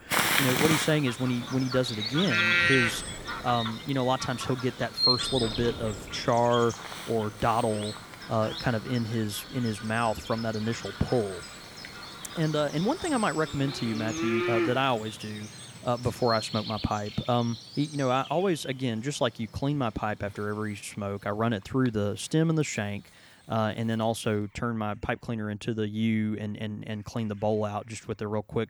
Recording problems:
animal sounds; loud; throughout; 2 dB below the speech
wind noise on the microphone; occasional gusts; until 15 s; 25 dB below the speech

